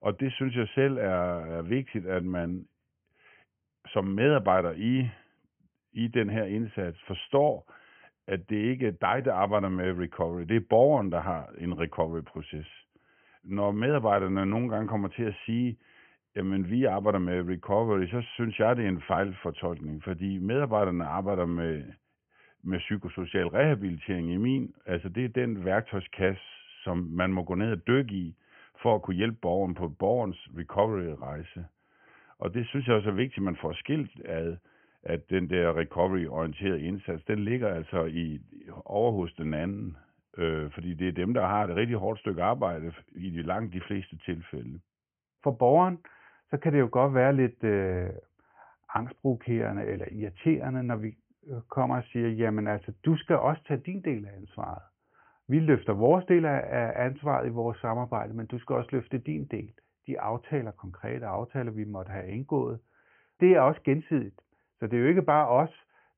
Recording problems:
high frequencies cut off; severe; nothing above 3 kHz

